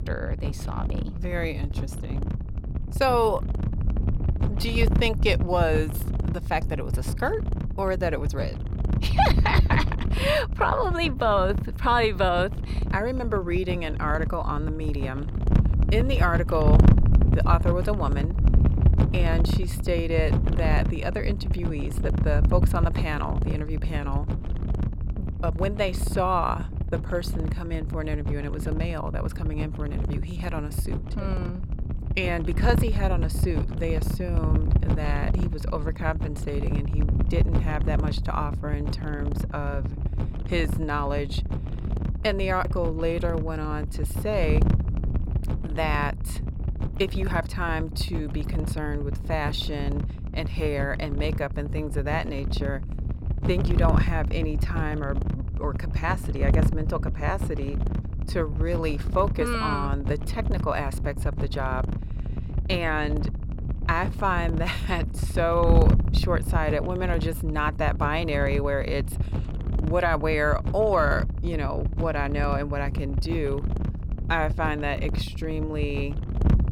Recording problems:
wind noise on the microphone; occasional gusts; 10 dB below the speech

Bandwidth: 16.5 kHz